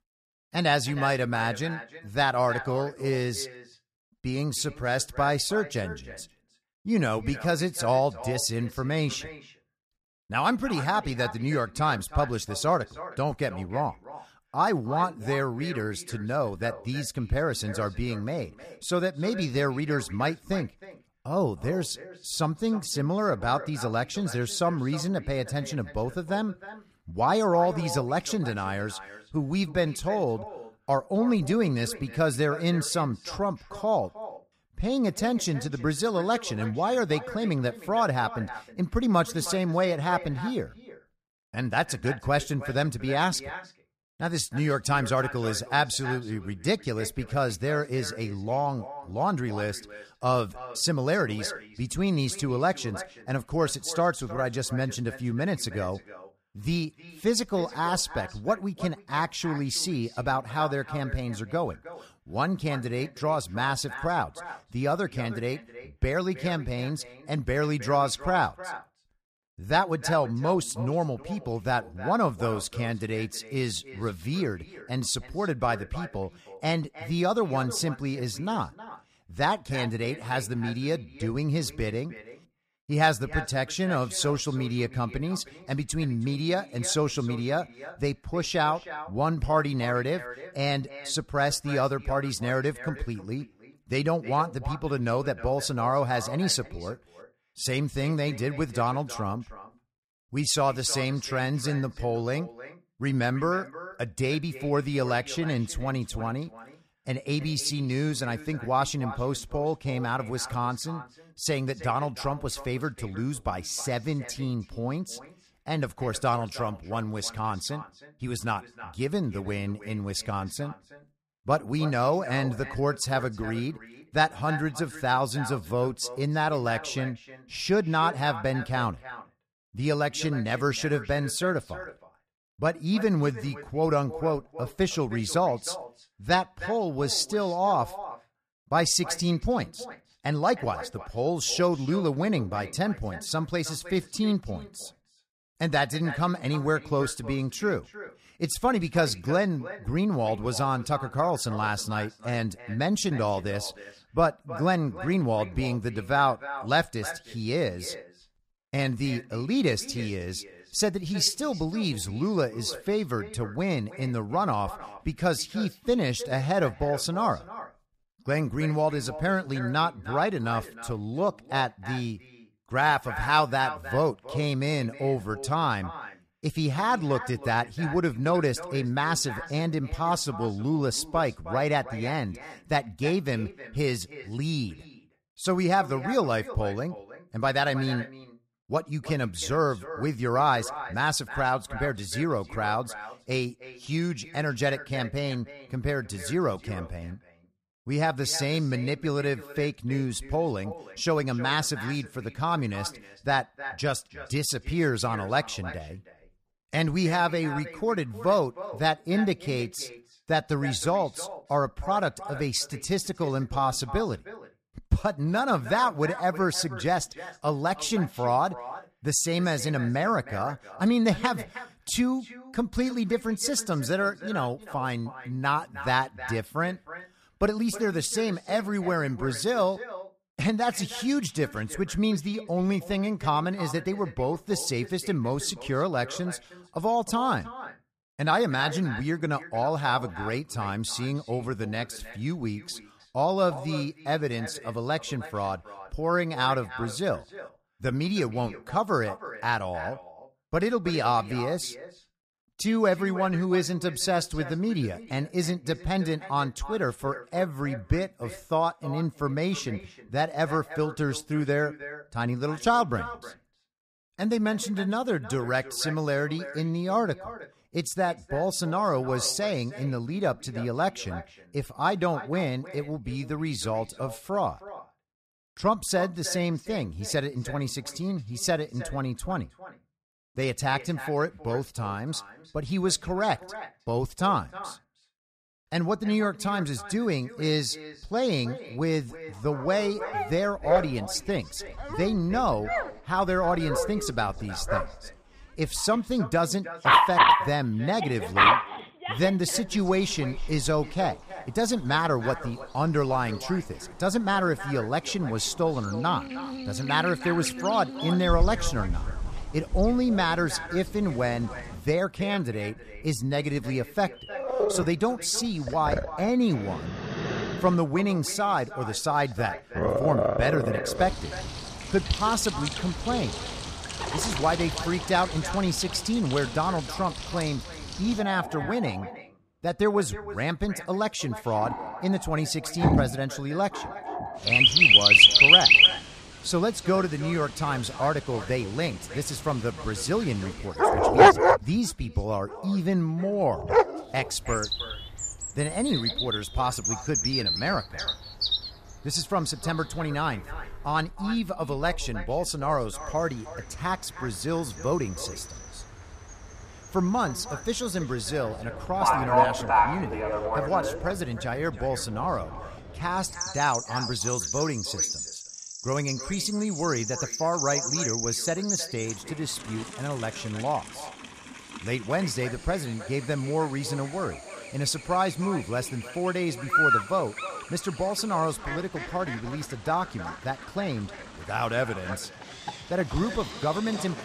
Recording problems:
echo of what is said; noticeable; throughout; 310 ms later, 15 dB below the speech
animal sounds; very loud; from 4:50 on; 5 dB above the speech

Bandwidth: 14.5 kHz